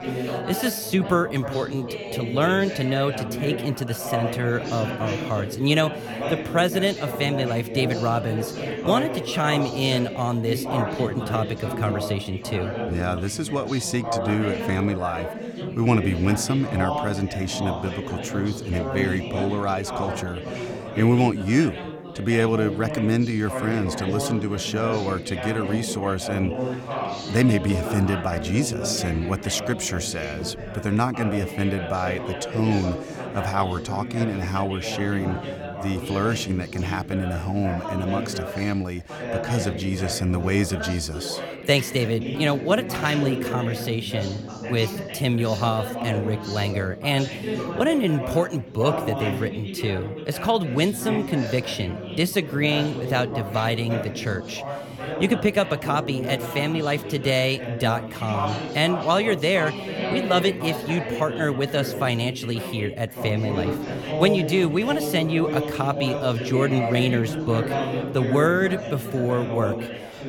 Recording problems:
background chatter; loud; throughout; 4 voices, 6 dB below the speech

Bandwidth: 17.5 kHz